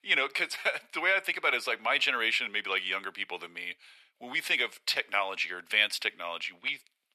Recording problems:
thin; very; fading below 850 Hz

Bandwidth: 13.5 kHz